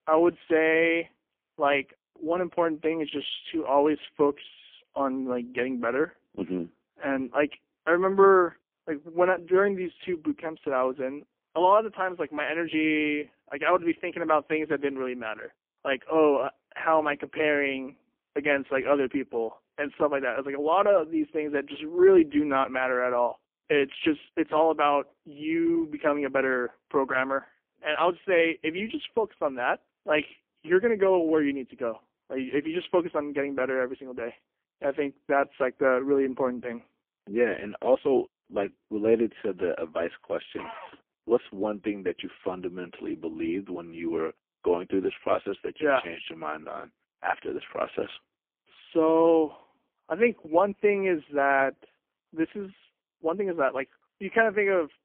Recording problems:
phone-call audio; poor line; nothing above 3.5 kHz

